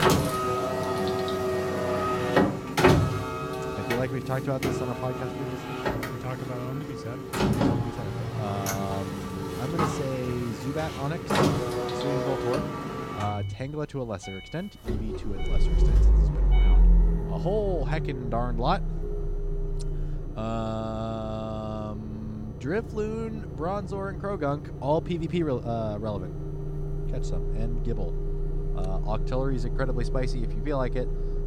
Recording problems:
traffic noise; very loud; throughout; 3 dB above the speech

